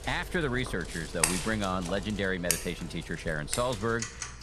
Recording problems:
household noises; loud; throughout; 2 dB below the speech

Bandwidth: 14.5 kHz